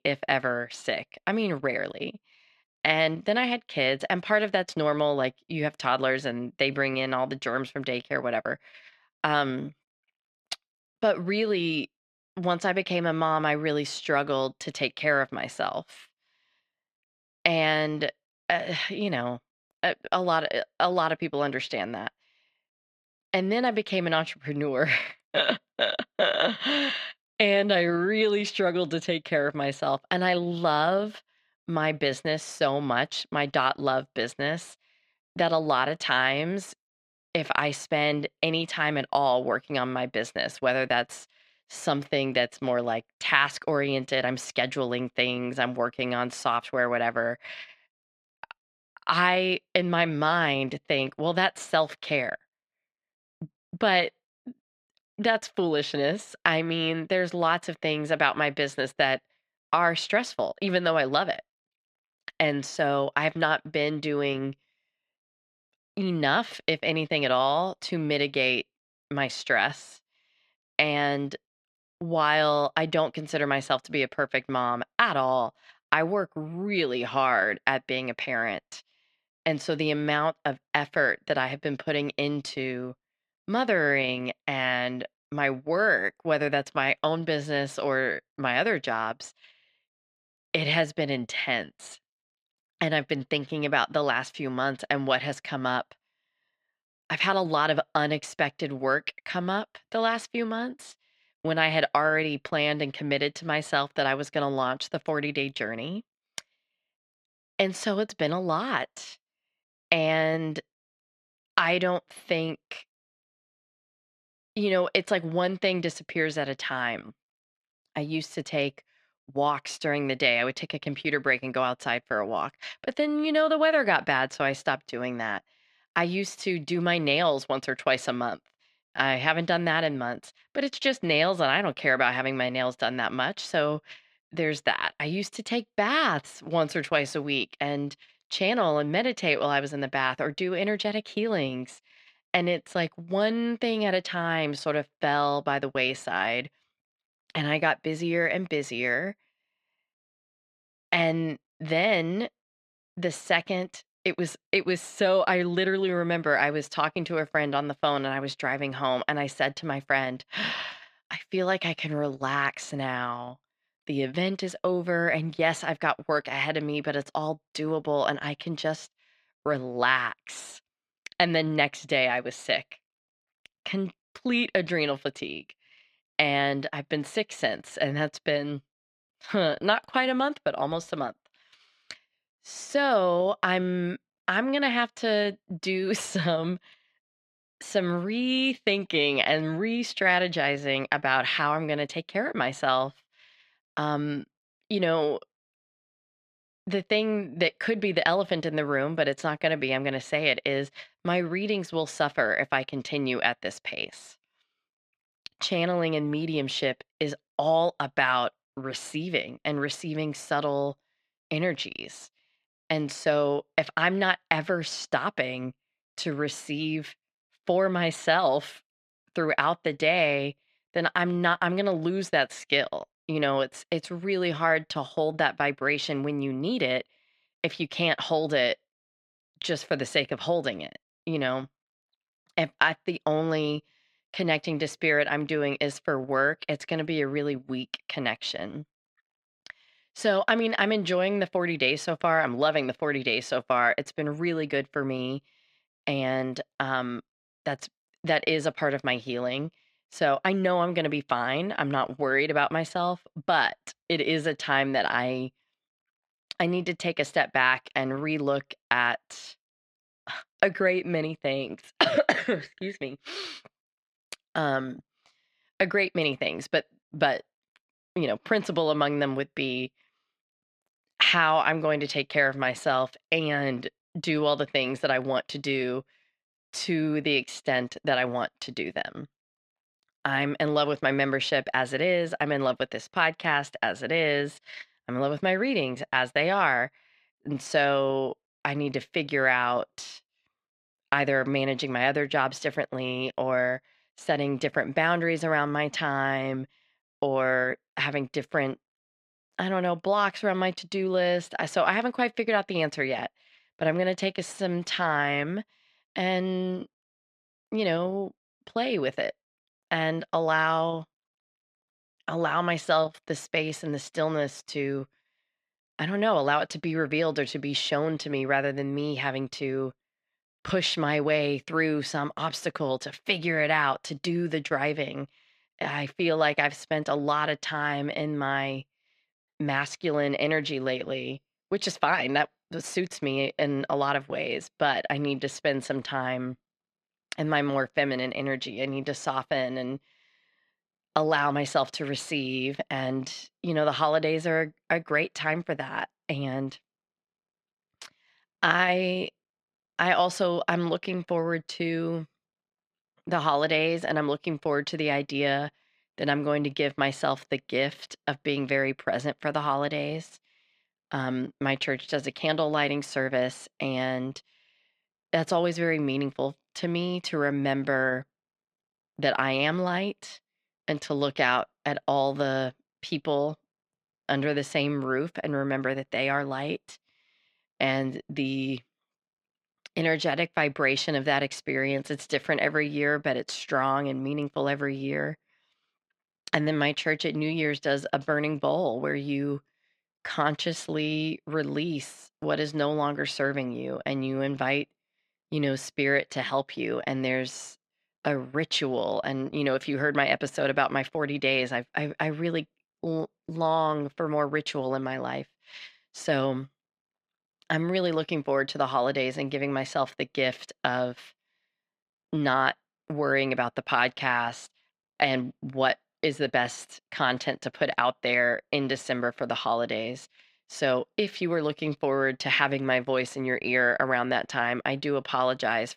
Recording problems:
muffled; slightly; fading above 3 kHz

